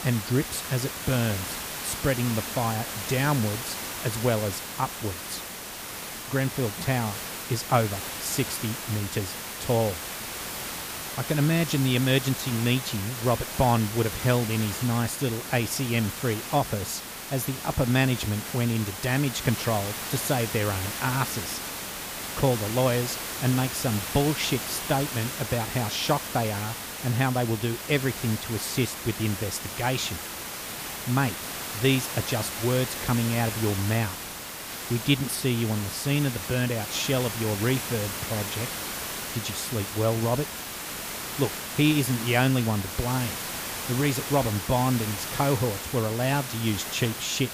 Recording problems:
hiss; loud; throughout; 5 dB below the speech

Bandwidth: 15 kHz